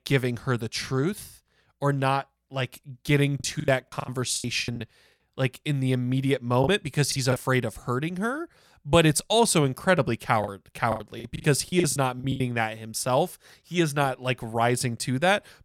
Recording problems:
choppy; very; from 3.5 to 7.5 s and from 10 to 12 s; 17% of the speech affected

